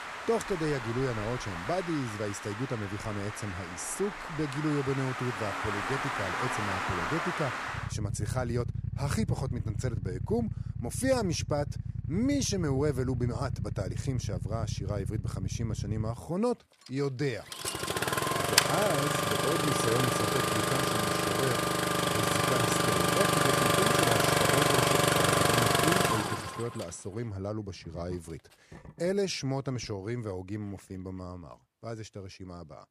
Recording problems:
traffic noise; very loud; throughout; 4 dB above the speech

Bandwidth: 15 kHz